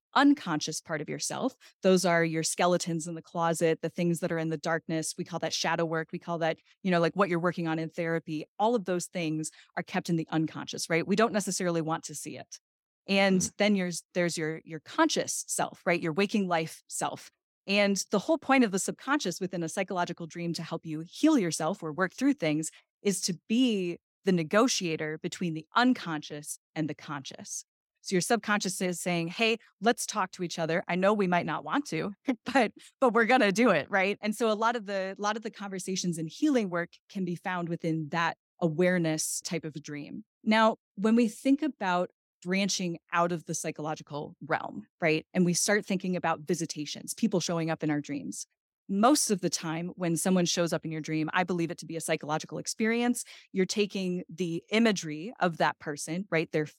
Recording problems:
none

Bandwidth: 17 kHz